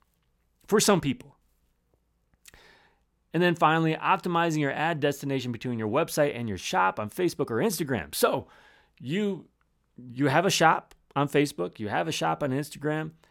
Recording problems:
none

